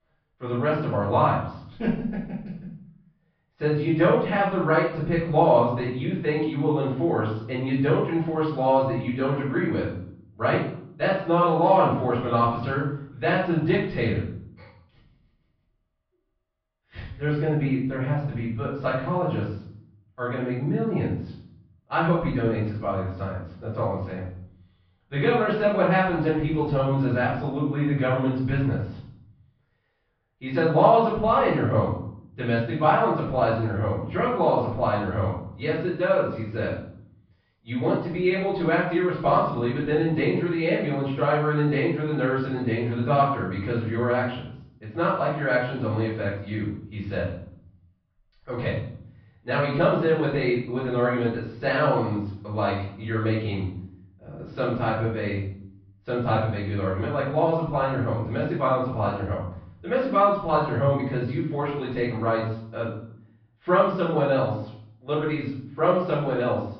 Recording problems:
off-mic speech; far
room echo; noticeable; dies away in 0.7 s
muffled; slightly; fading above 2.5 kHz
high frequencies cut off; noticeable; nothing above 5.5 kHz

